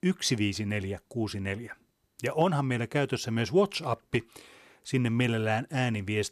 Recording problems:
none

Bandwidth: 13.5 kHz